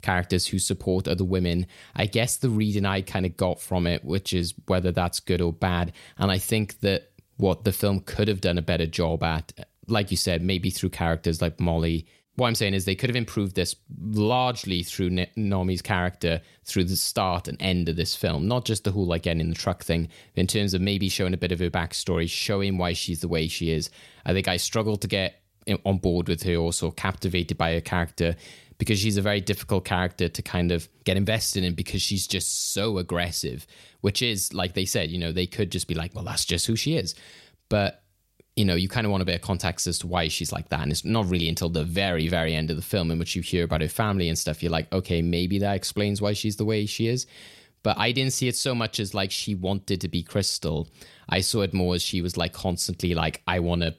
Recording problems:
none

